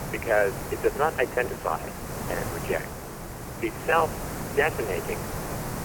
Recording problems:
phone-call audio; poor line; nothing above 3 kHz
hiss; loud; throughout; 7 dB below the speech
choppy; very; from 0.5 to 5 s; 8% of the speech affected

